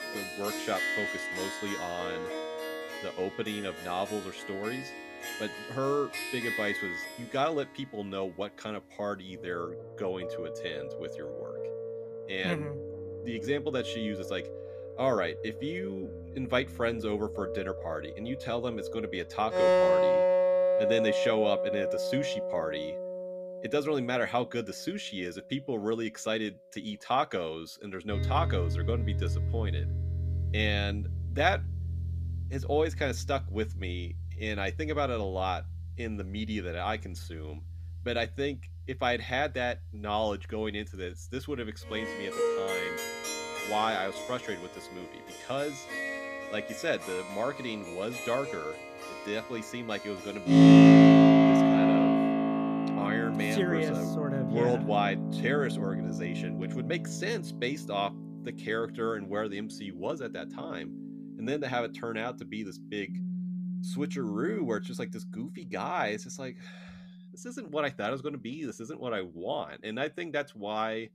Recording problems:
background music; very loud; throughout; 5 dB above the speech

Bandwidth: 14.5 kHz